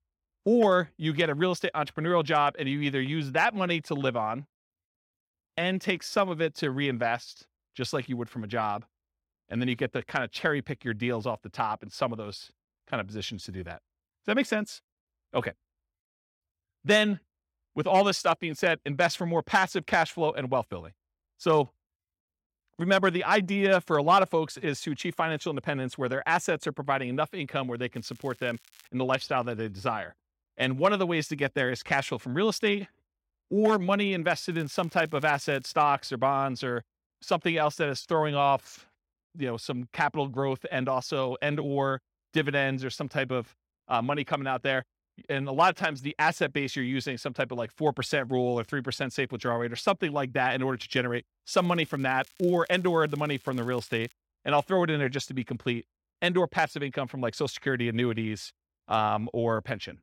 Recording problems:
crackling; faint; at 28 s, from 35 to 36 s and from 52 to 54 s; 25 dB below the speech

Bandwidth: 16.5 kHz